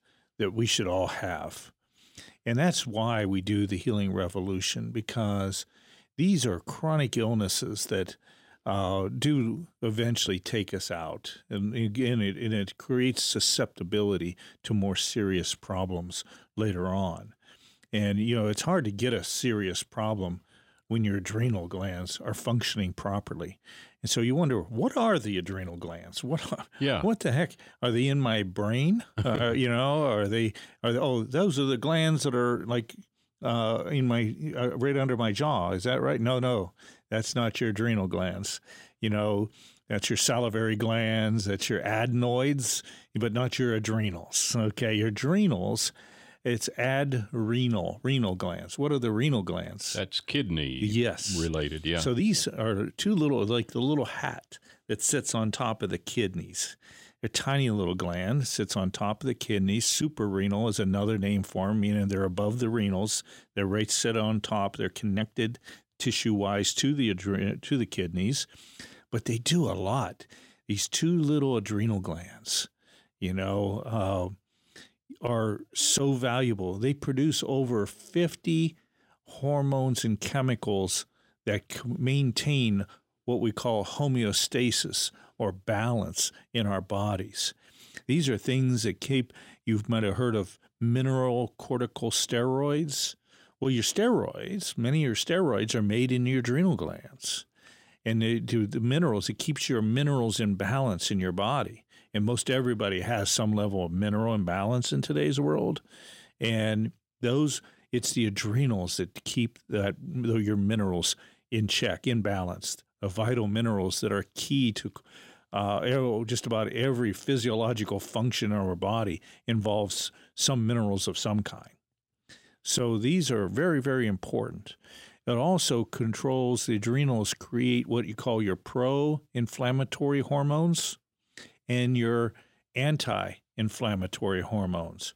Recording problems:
none

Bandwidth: 16 kHz